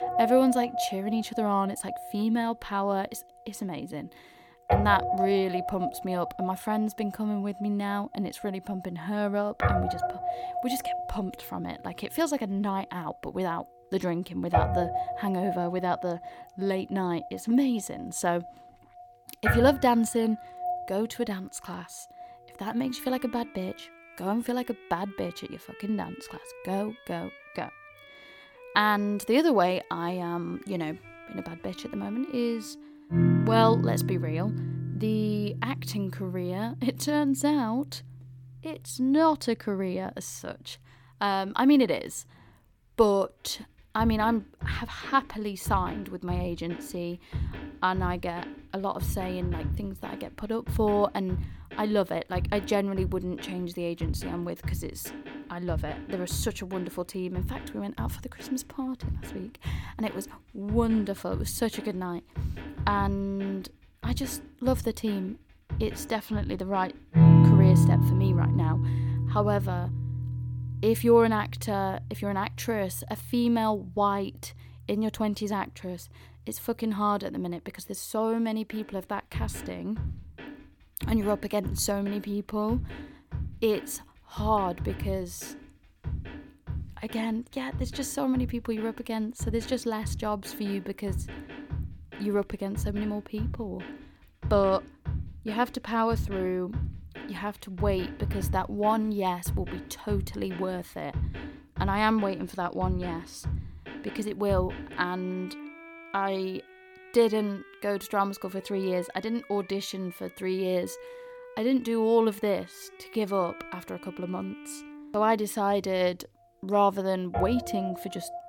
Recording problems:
background music; loud; throughout; 2 dB below the speech

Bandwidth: 18 kHz